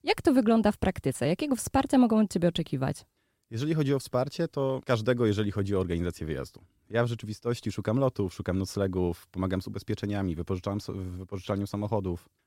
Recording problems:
none

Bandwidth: 16.5 kHz